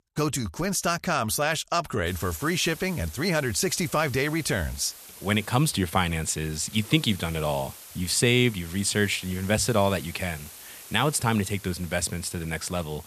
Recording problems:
hiss; noticeable; from 2 s on; 15 dB below the speech

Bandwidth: 14 kHz